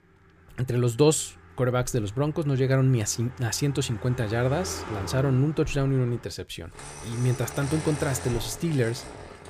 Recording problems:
traffic noise; noticeable; throughout; 15 dB below the speech

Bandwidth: 15 kHz